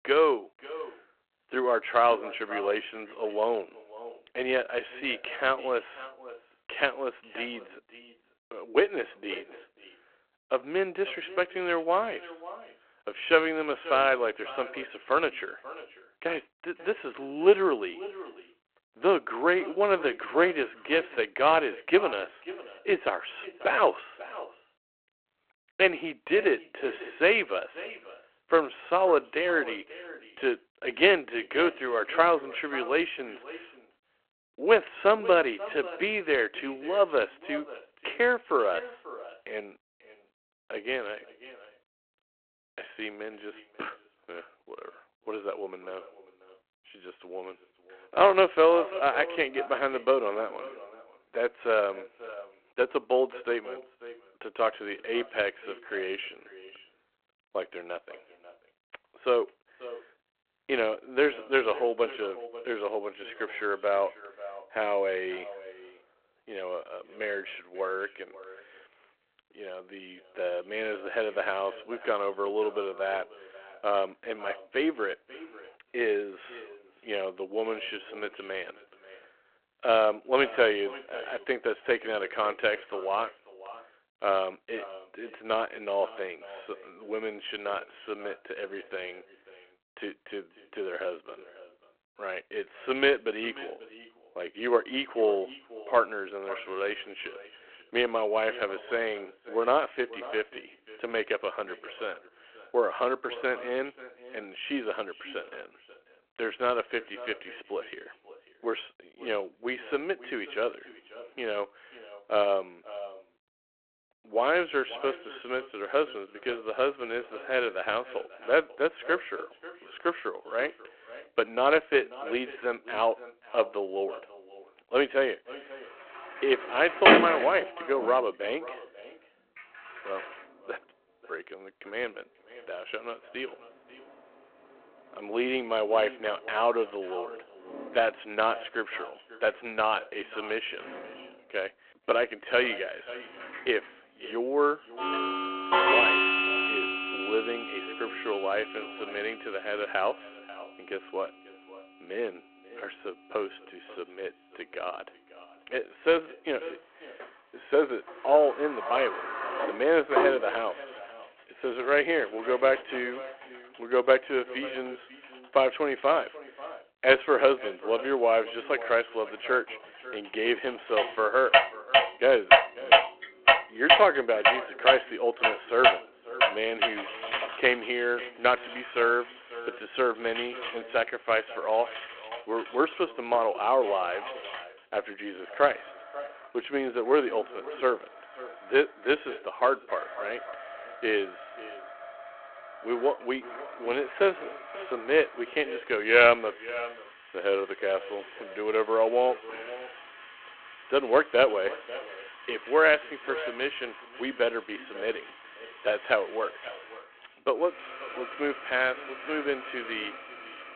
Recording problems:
echo of what is said; noticeable; throughout; 540 ms later, 15 dB below the speech
phone-call audio
household noises; very loud; from 2:06 on; 2 dB above the speech

